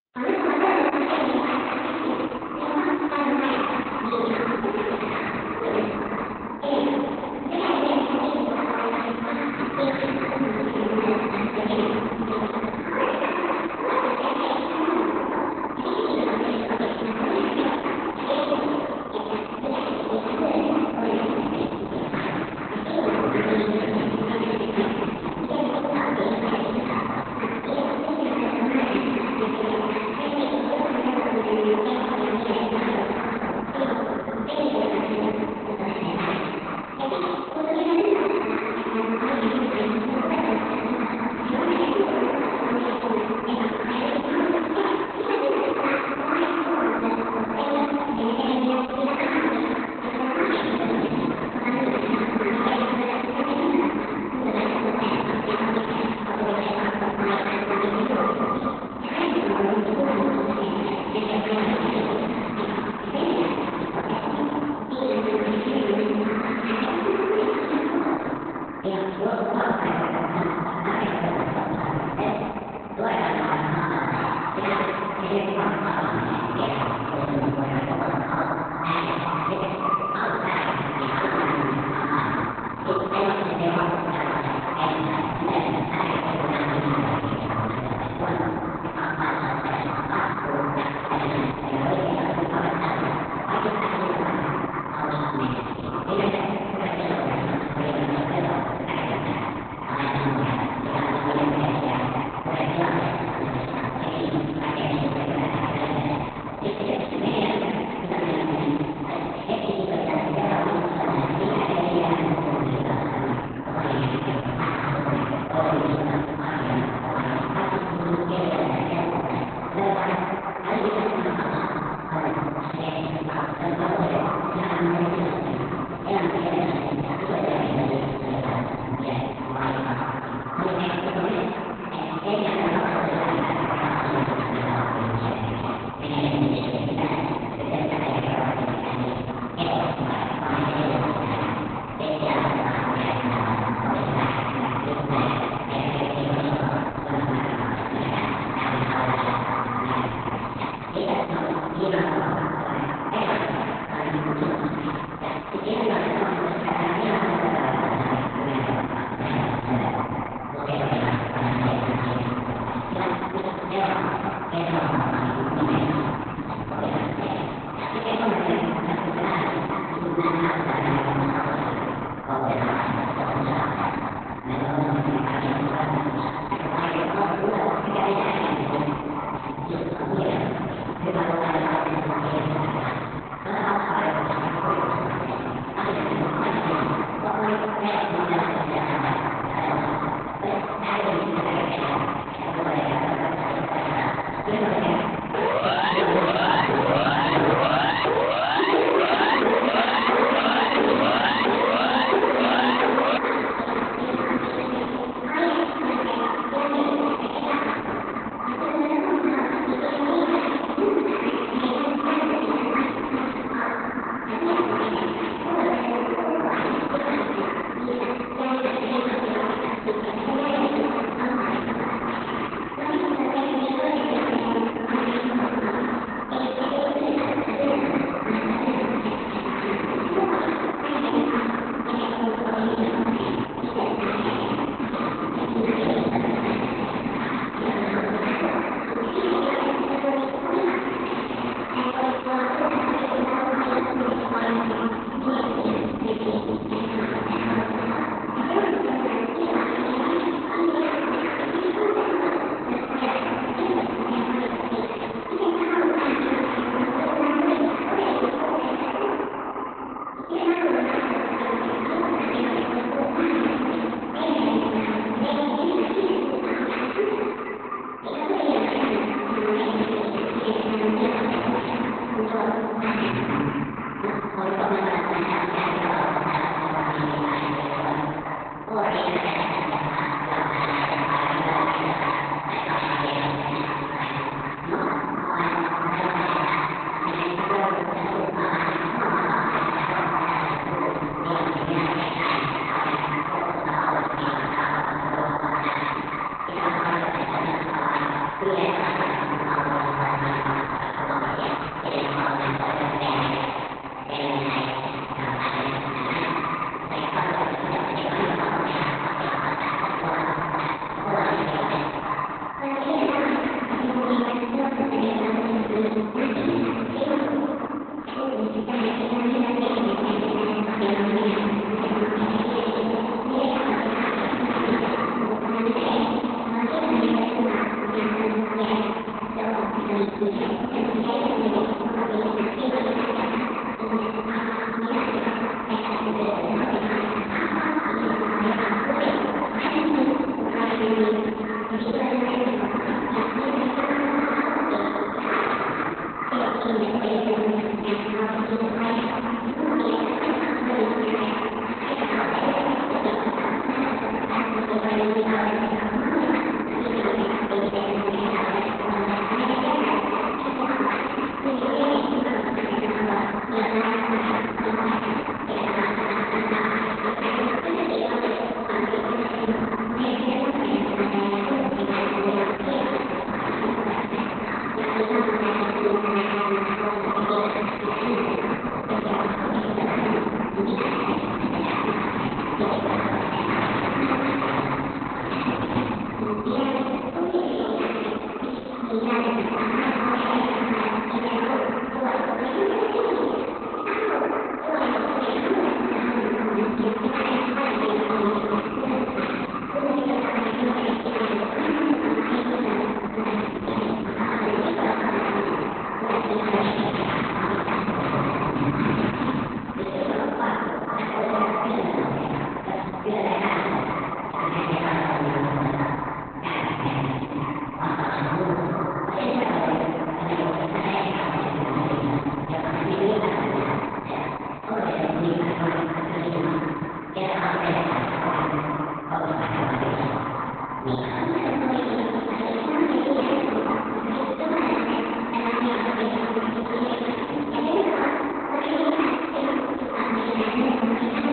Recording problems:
echo of what is said; strong; throughout; 460 ms later, 7 dB below the speech
room echo; strong; dies away in 2.8 s
off-mic speech; far
garbled, watery; badly; nothing above 4 kHz
wrong speed and pitch; too fast and too high; 1.5 times normal speed
siren; loud; from 3:15 to 3:23; peak 5 dB above the speech

